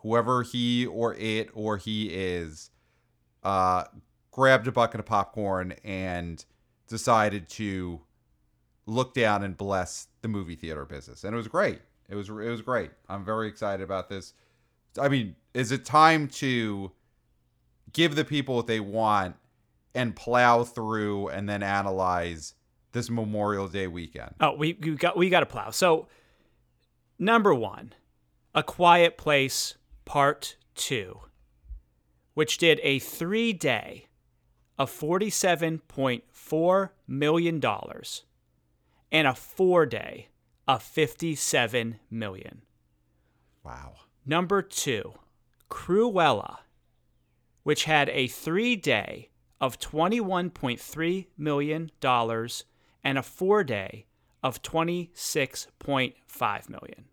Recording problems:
none

